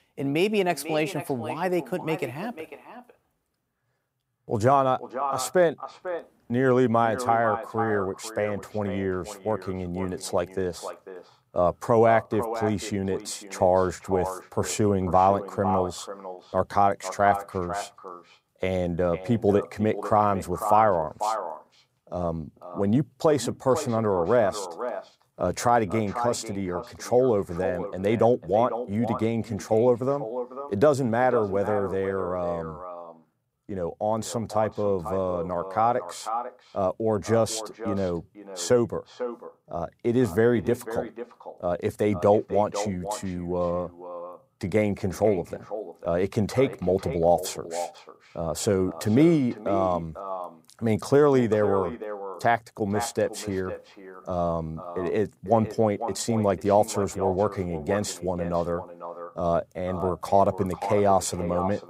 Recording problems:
echo of what is said; strong; throughout; 500 ms later, 10 dB below the speech

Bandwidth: 15.5 kHz